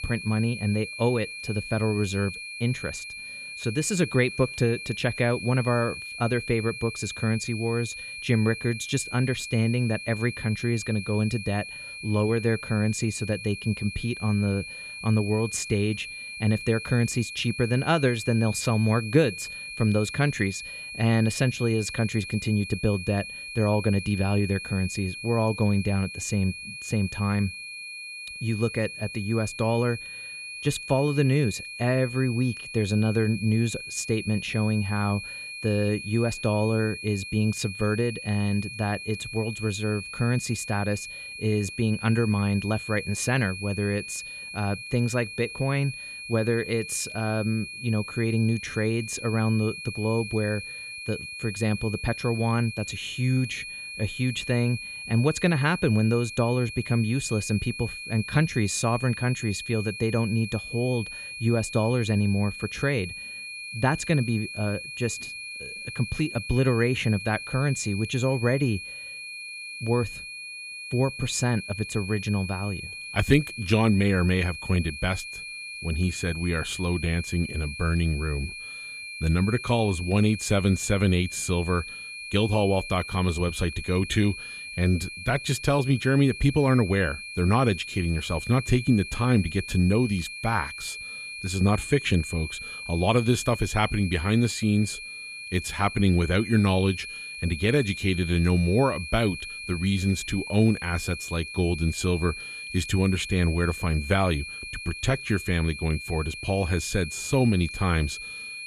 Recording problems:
high-pitched whine; loud; throughout; 2.5 kHz, 9 dB below the speech

